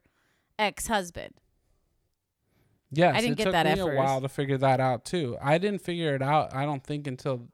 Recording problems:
none

